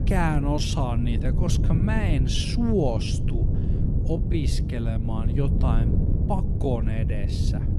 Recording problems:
wrong speed, natural pitch; too slow; 0.6 times normal speed
wind noise on the microphone; heavy; 6 dB below the speech

